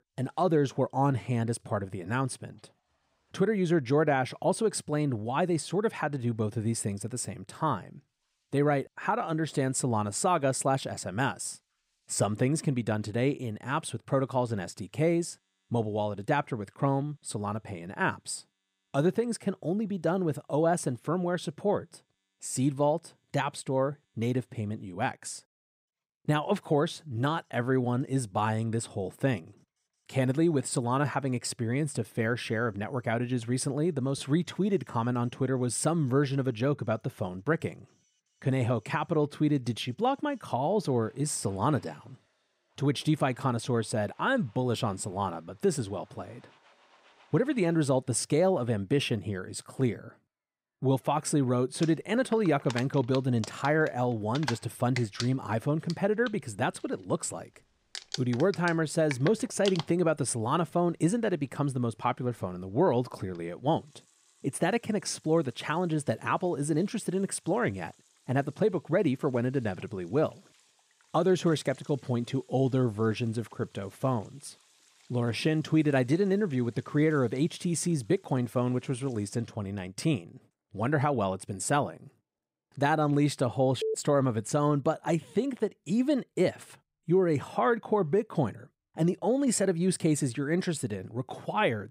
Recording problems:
household noises; noticeable; throughout; 20 dB below the speech

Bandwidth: 15.5 kHz